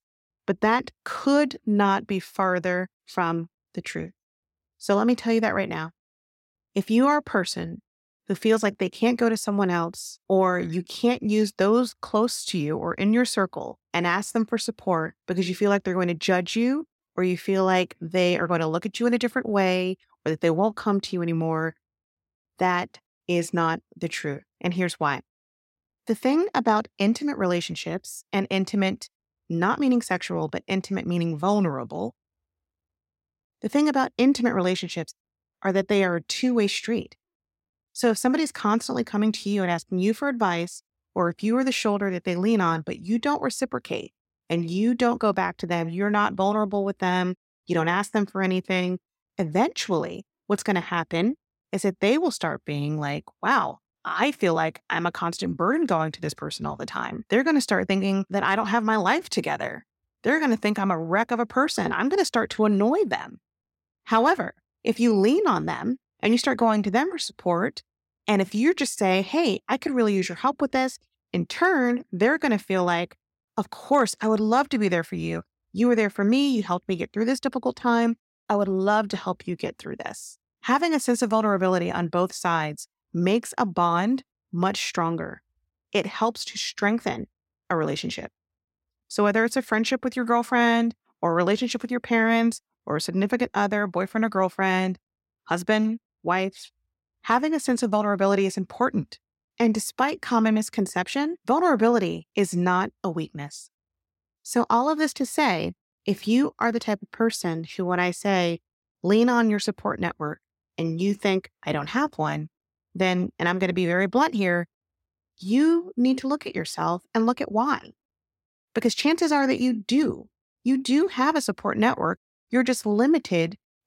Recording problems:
none

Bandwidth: 16.5 kHz